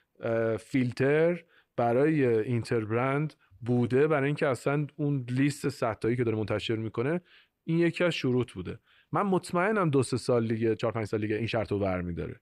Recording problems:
uneven, jittery; strongly; from 0.5 to 12 s

